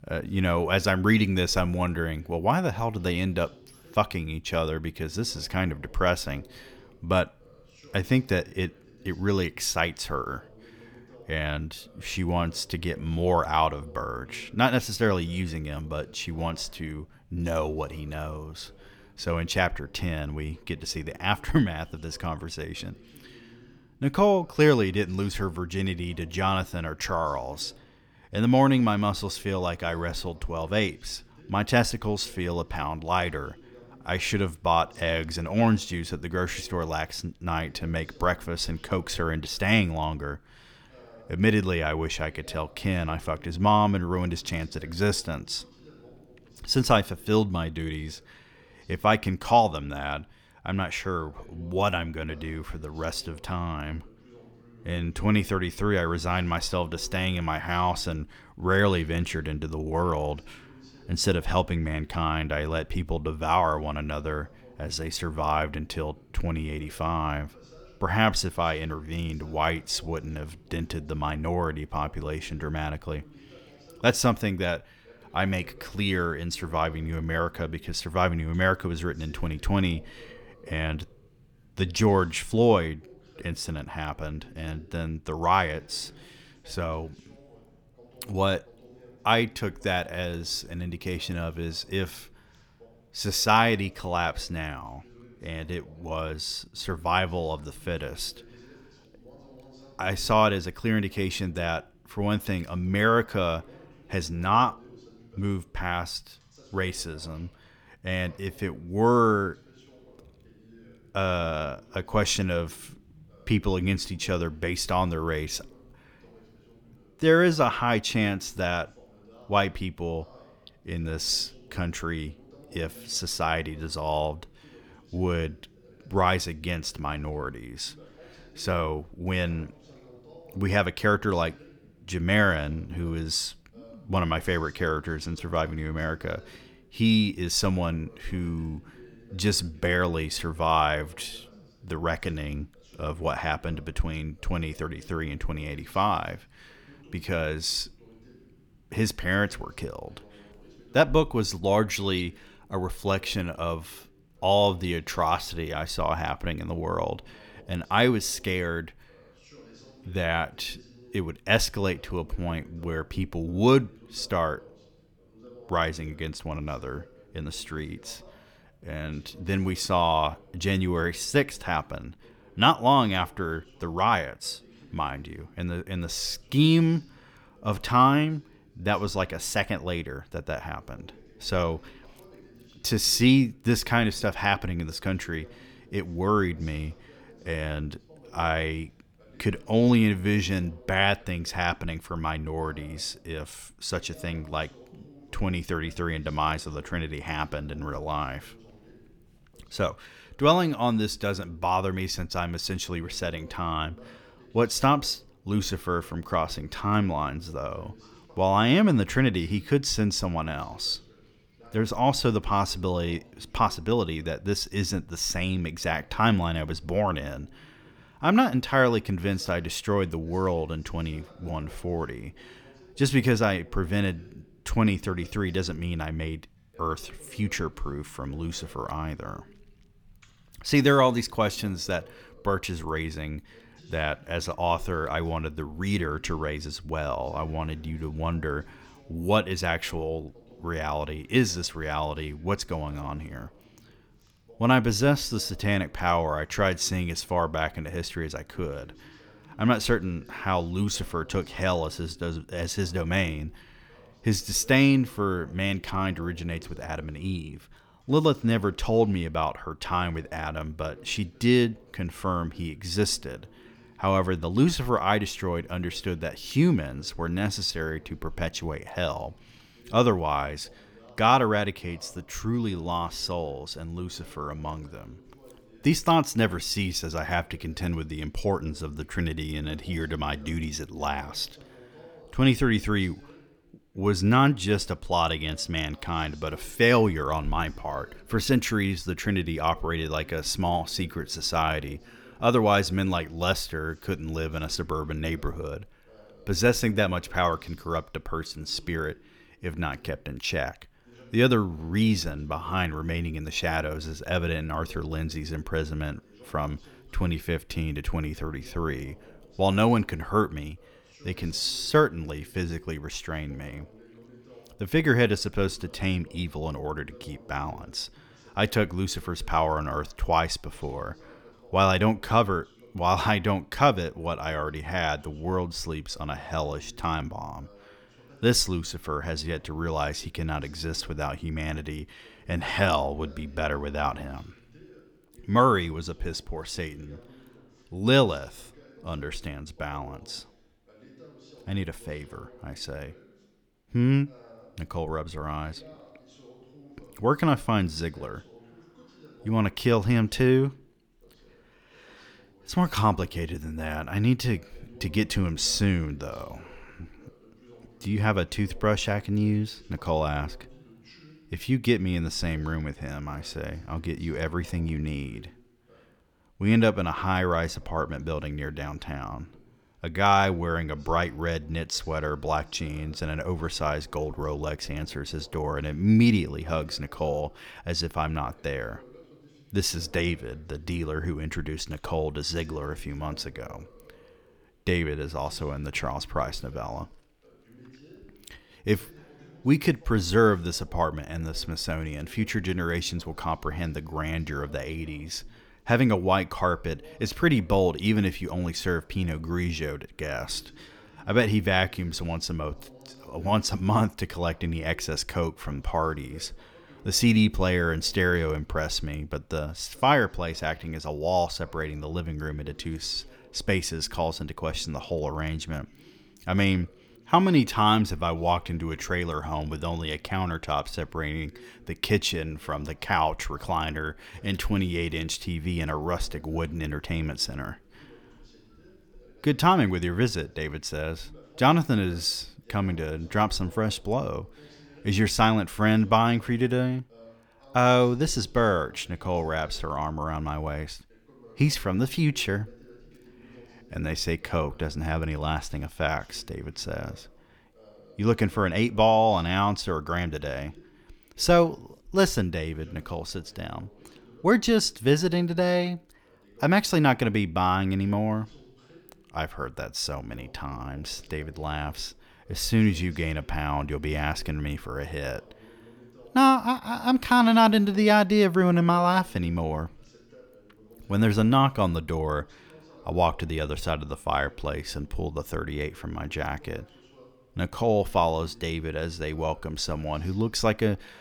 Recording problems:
voice in the background; faint; throughout; 25 dB below the speech

